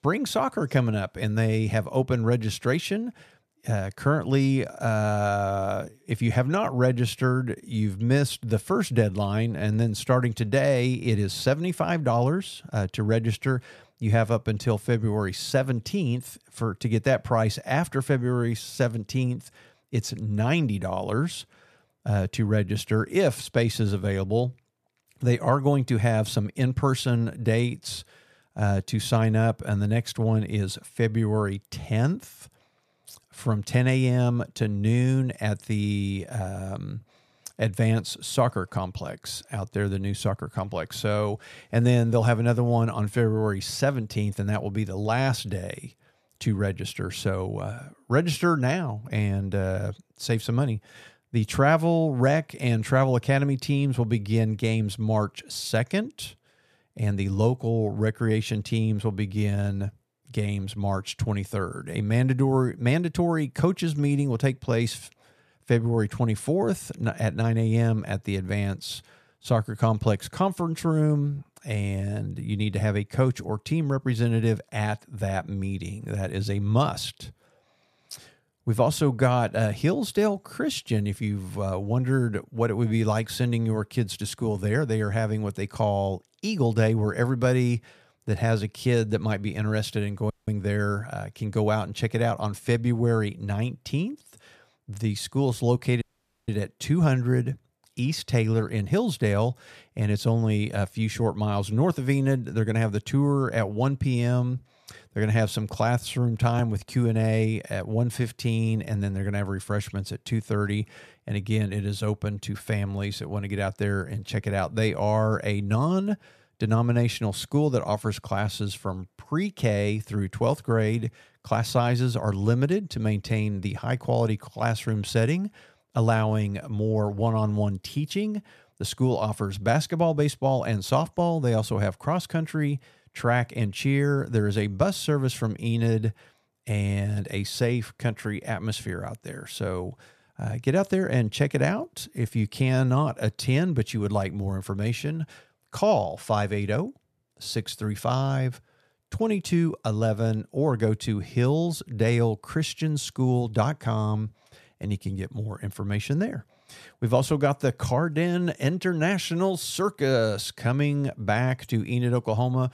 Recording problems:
audio cutting out; at 1:30 and at 1:36

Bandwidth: 14.5 kHz